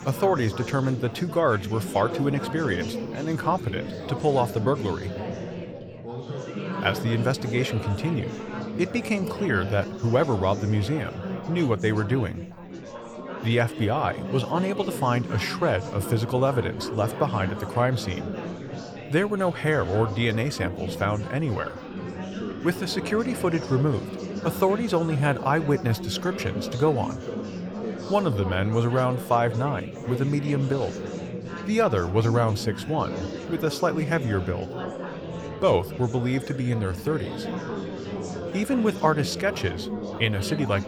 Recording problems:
chatter from many people; loud; throughout; 8 dB below the speech

